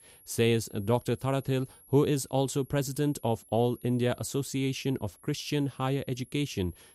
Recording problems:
high-pitched whine; faint; throughout; 11.5 kHz, 25 dB below the speech

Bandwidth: 14.5 kHz